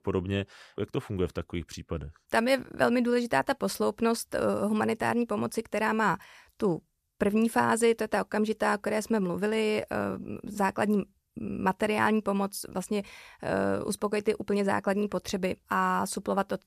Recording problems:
none

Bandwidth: 14.5 kHz